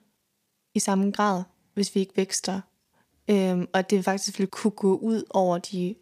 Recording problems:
uneven, jittery; slightly; from 0.5 to 5 s

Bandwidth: 15 kHz